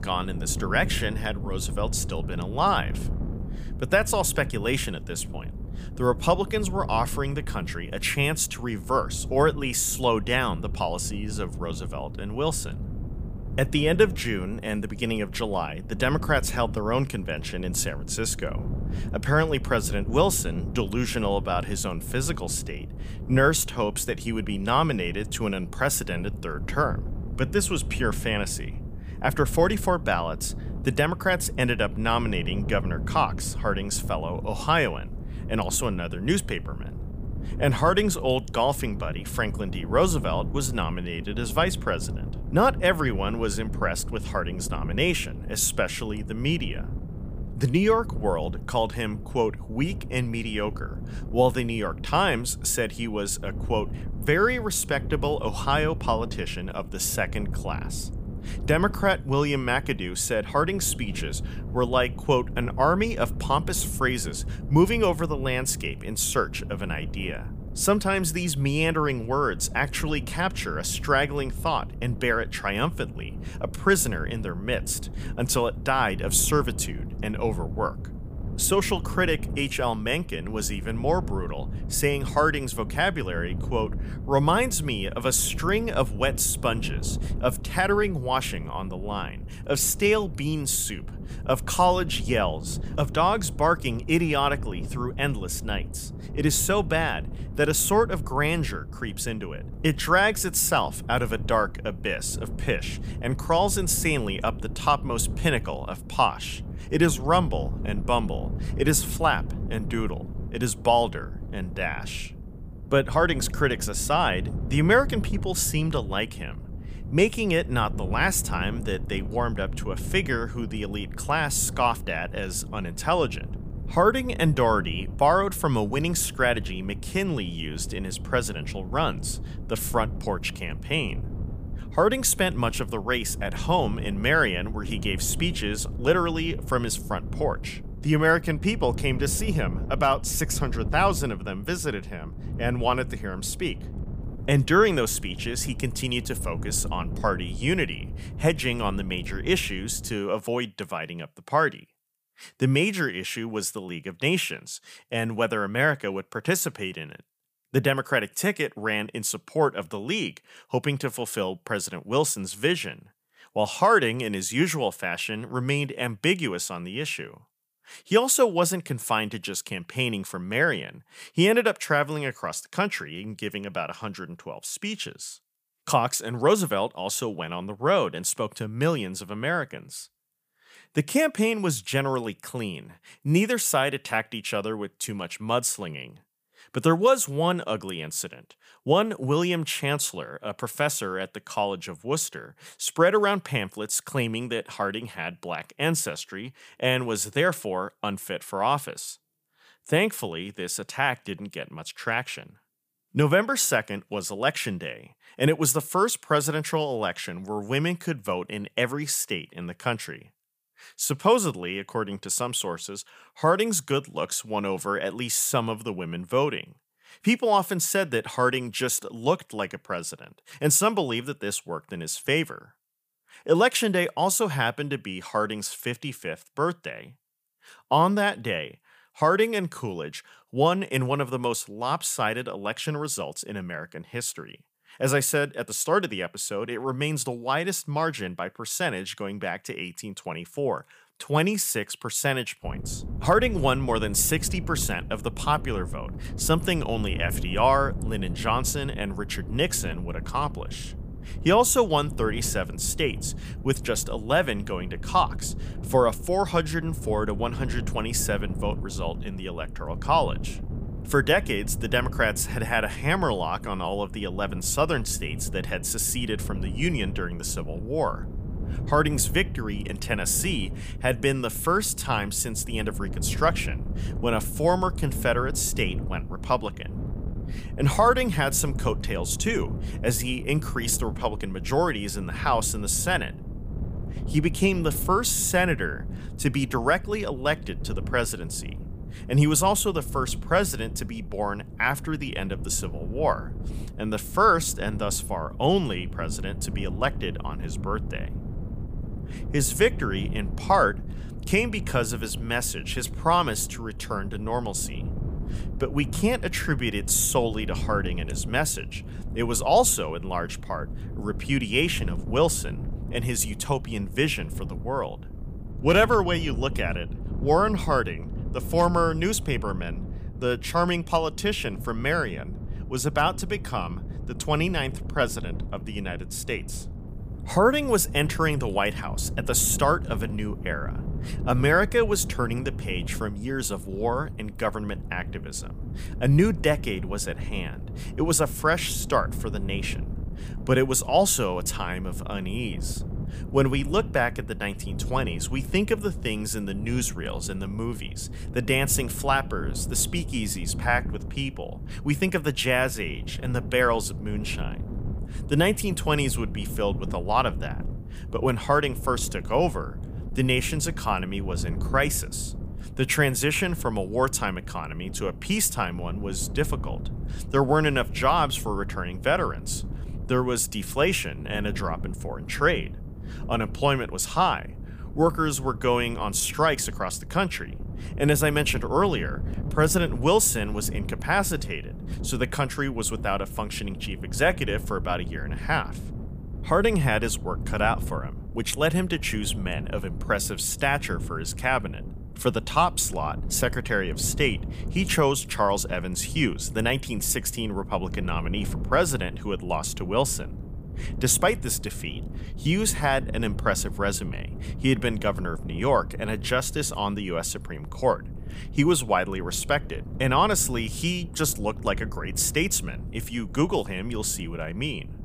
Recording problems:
wind noise on the microphone; occasional gusts; until 2:30 and from 4:03 on; 20 dB below the speech

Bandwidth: 15 kHz